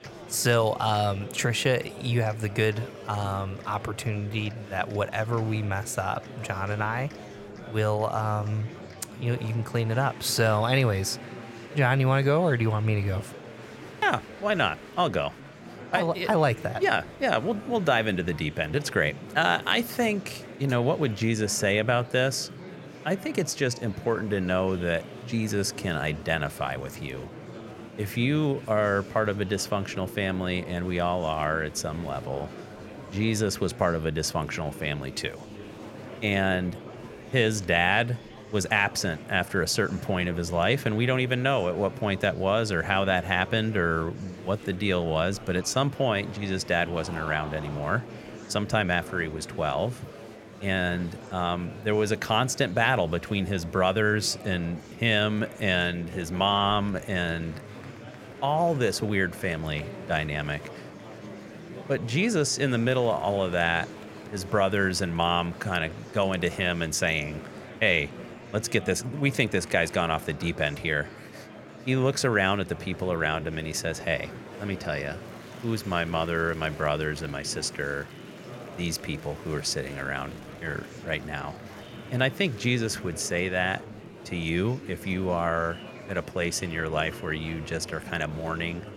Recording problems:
murmuring crowd; noticeable; throughout; 15 dB below the speech

